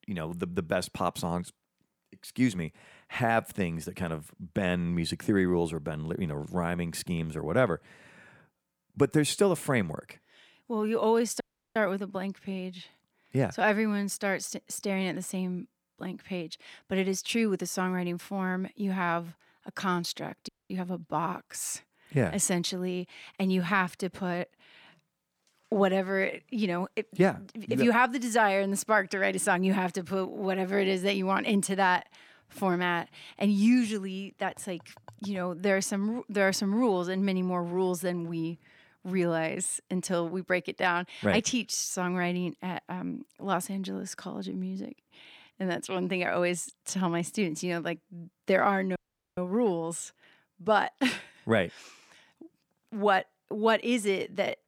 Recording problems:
audio cutting out; at 11 s, at 20 s and at 49 s

